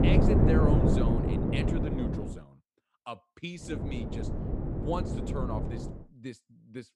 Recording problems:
wind noise on the microphone; heavy; until 2.5 s and from 3.5 to 6 s; 4 dB above the speech

